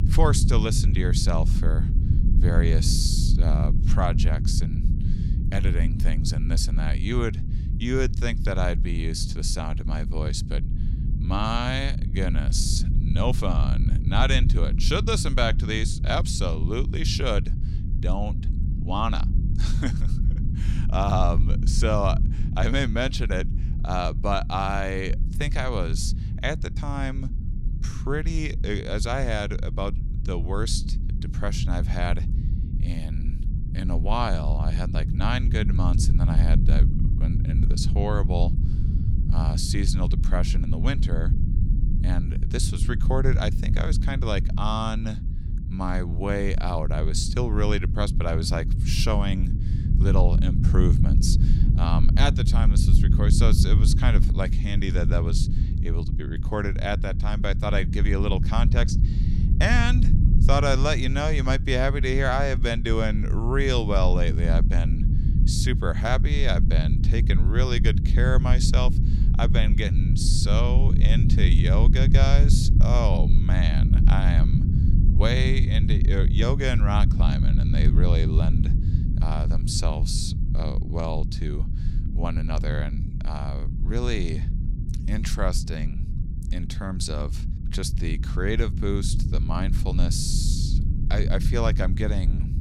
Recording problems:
low rumble; loud; throughout; 9 dB below the speech

